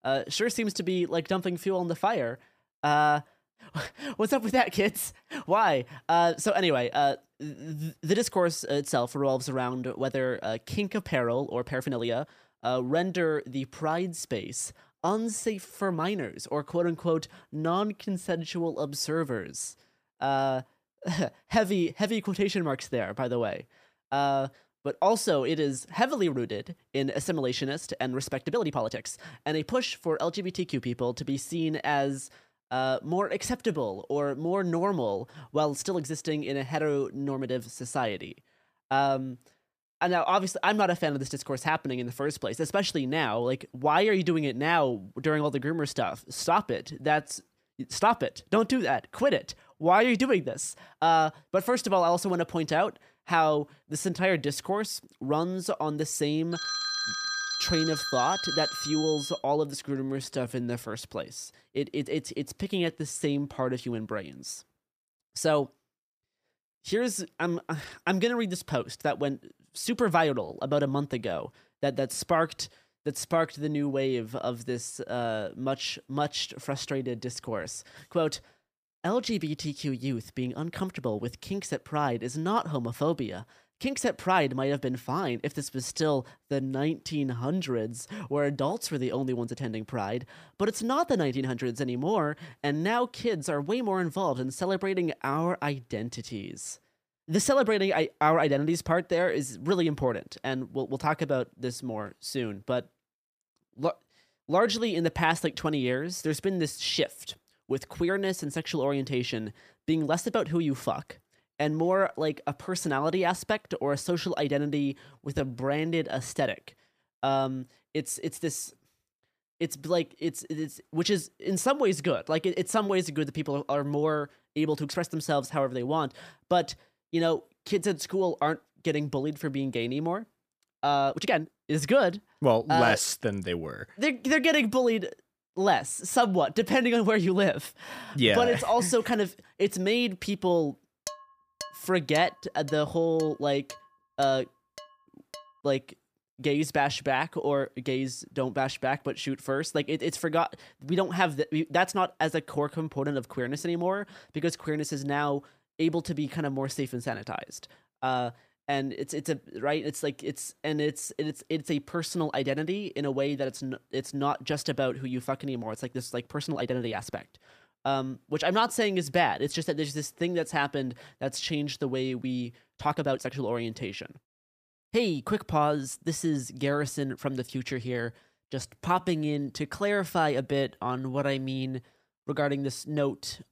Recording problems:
uneven, jittery; strongly; from 3.5 s to 3:01
phone ringing; loud; from 57 to 59 s; peak 1 dB above the speech
clattering dishes; faint; from 2:21 to 2:25; peak 10 dB below the speech

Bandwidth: 15 kHz